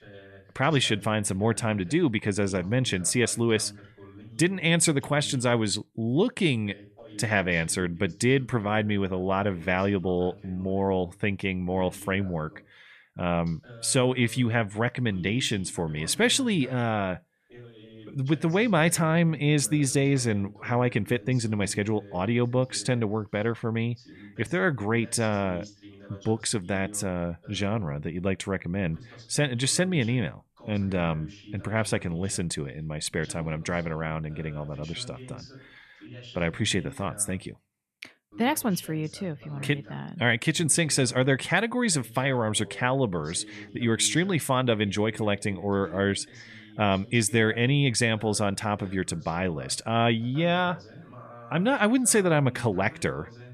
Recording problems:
voice in the background; faint; throughout; 20 dB below the speech

